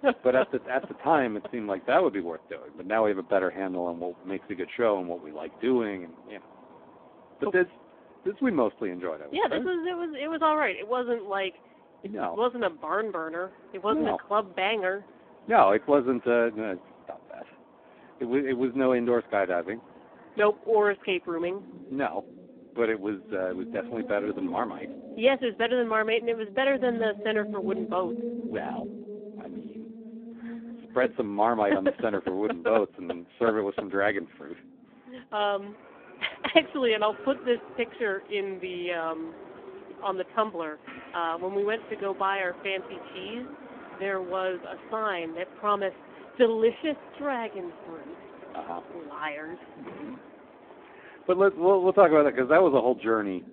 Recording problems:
phone-call audio; poor line
traffic noise; noticeable; throughout; 15 dB below the speech

